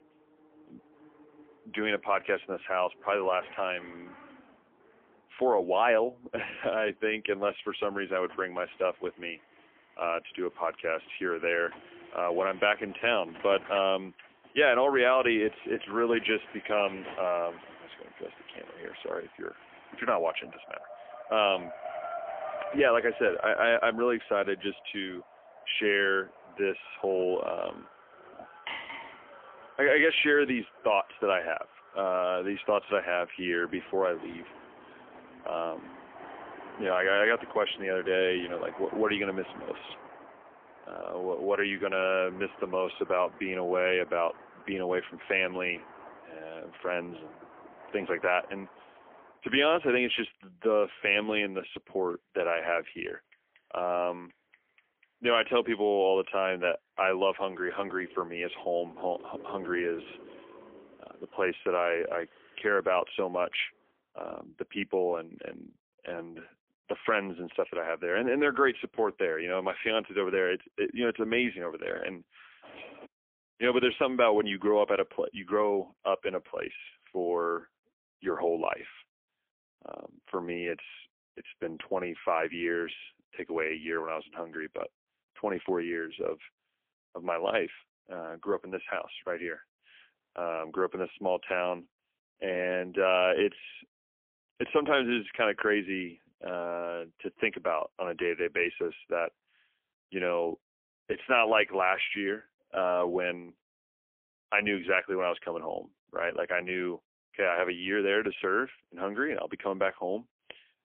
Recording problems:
phone-call audio; poor line; nothing above 3.5 kHz
traffic noise; noticeable; until 1:04; 20 dB below the speech
clattering dishes; noticeable; at 29 s; peak 7 dB below the speech
jangling keys; faint; at 1:13; peak 15 dB below the speech

